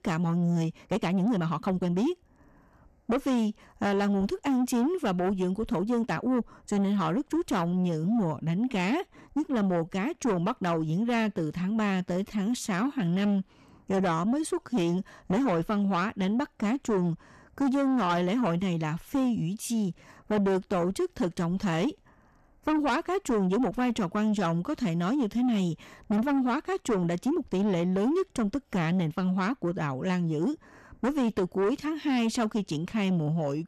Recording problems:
distortion; slight; 10 dB below the speech
uneven, jittery; strongly; from 0.5 to 15 s

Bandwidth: 13.5 kHz